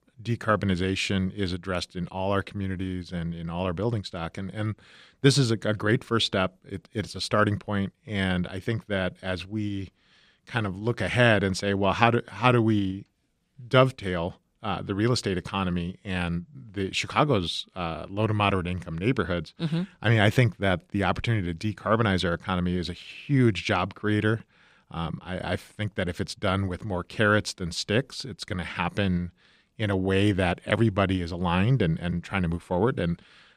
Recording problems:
none

